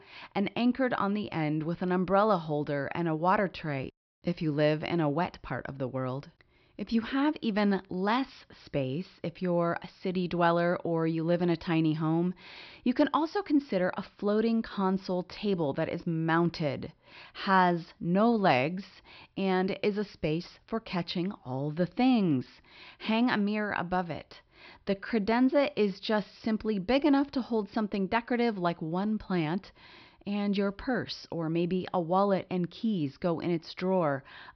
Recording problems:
high frequencies cut off; noticeable; nothing above 5.5 kHz

